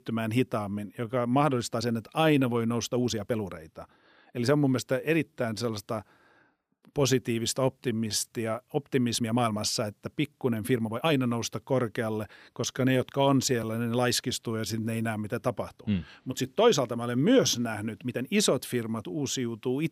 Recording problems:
uneven, jittery; strongly; from 1 to 19 s

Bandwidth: 15 kHz